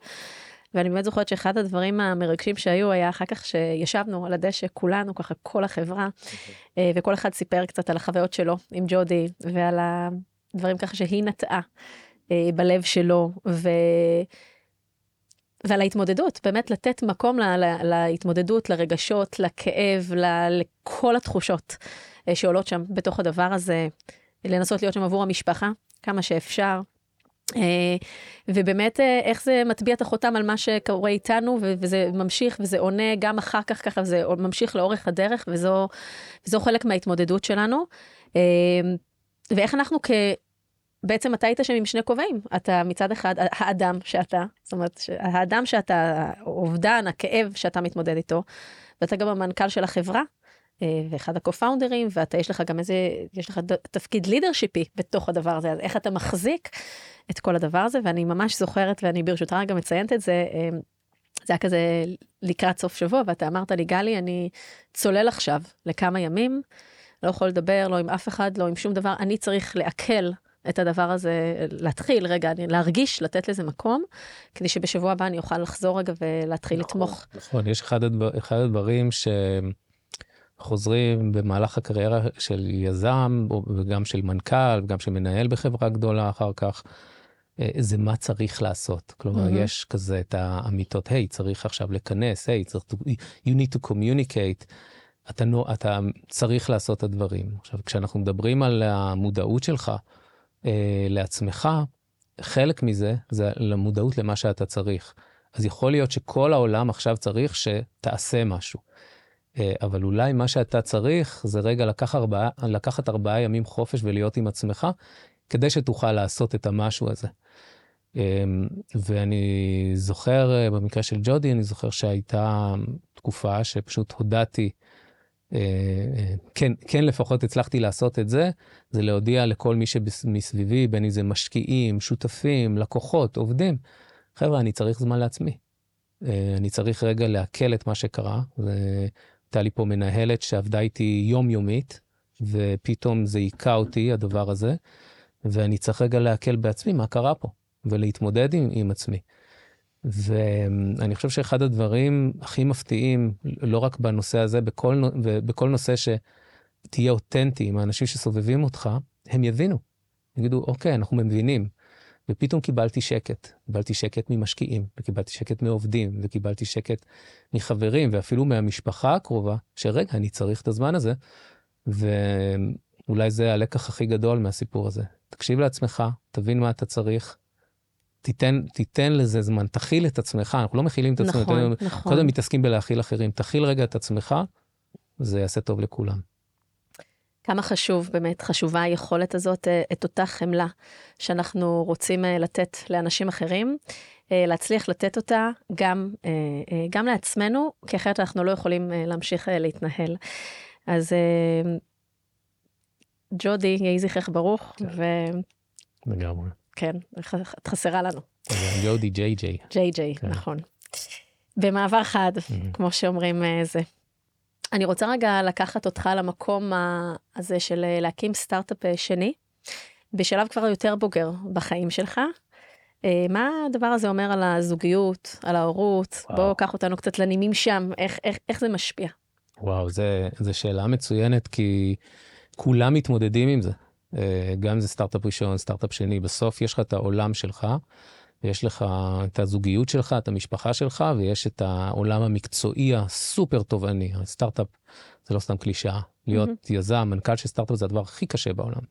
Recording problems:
none

